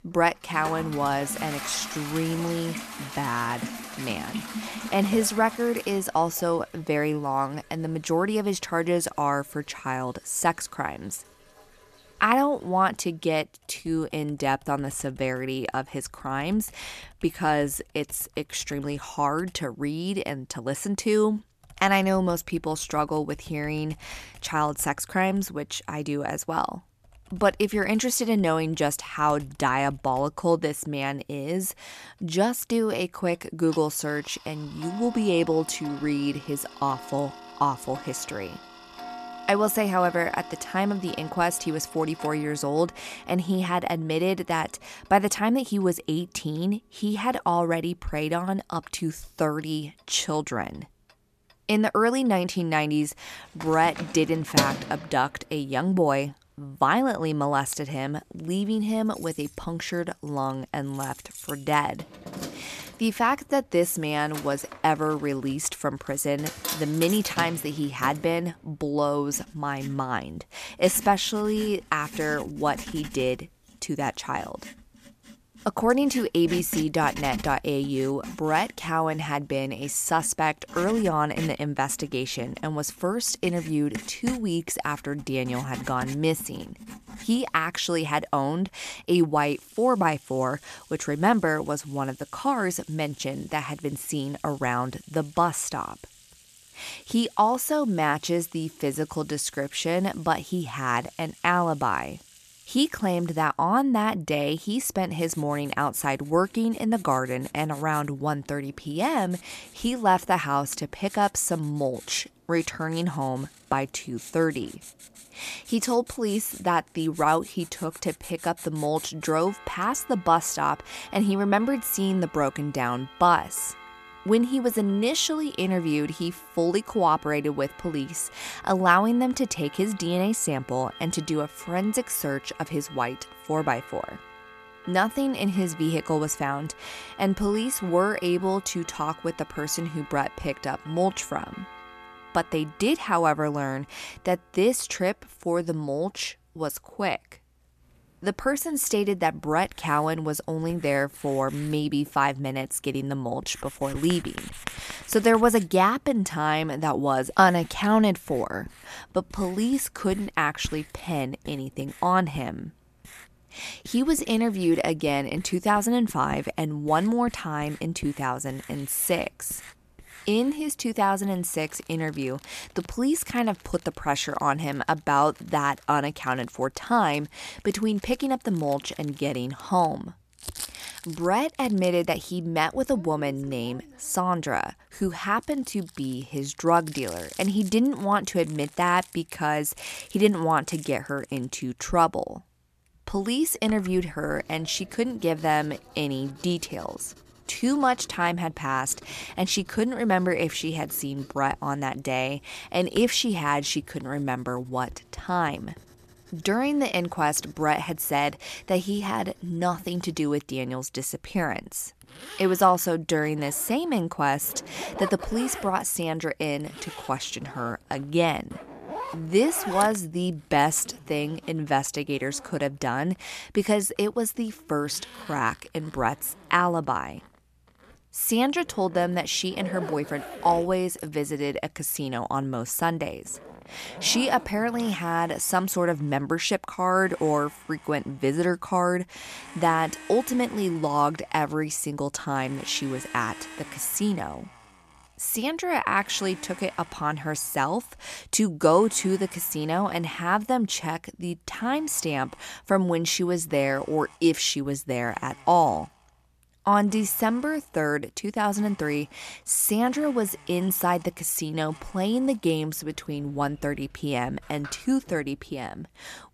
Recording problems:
household noises; noticeable; throughout; 15 dB below the speech

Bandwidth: 14 kHz